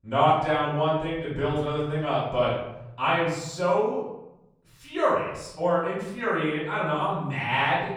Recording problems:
off-mic speech; far
room echo; noticeable; dies away in 0.9 s

